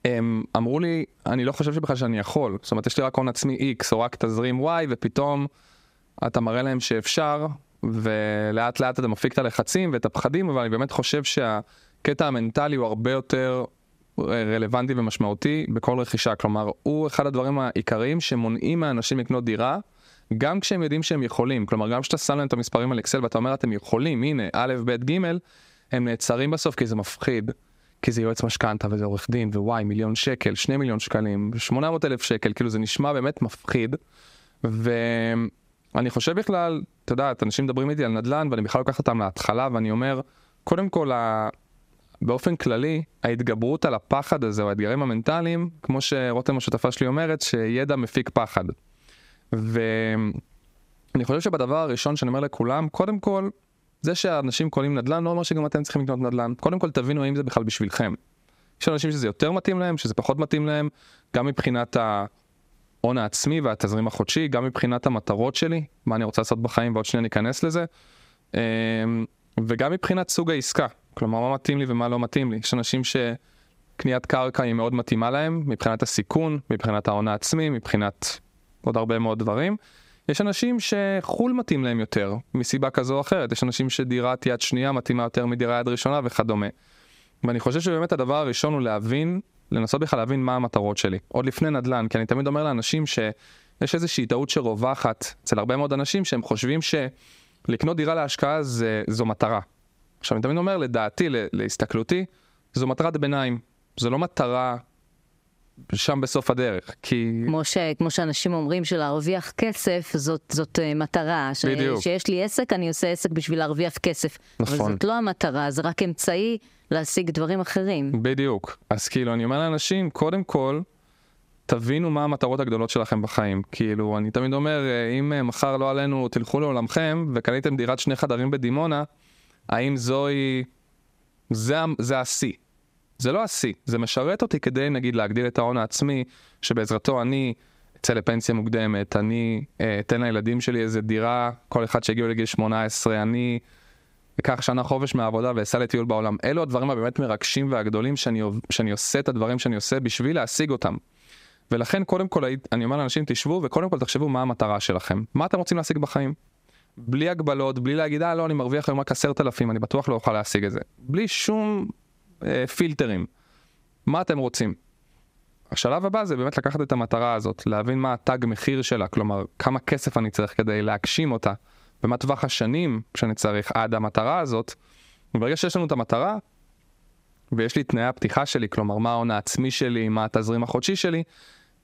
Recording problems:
squashed, flat; somewhat

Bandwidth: 15.5 kHz